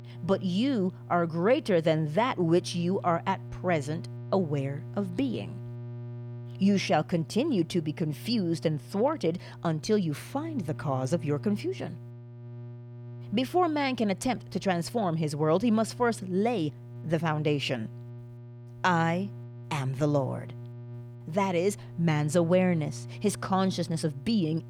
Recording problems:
electrical hum; faint; throughout; 60 Hz, 25 dB below the speech

